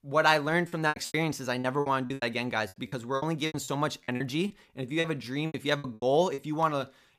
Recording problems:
choppy; very; 16% of the speech affected

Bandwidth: 15 kHz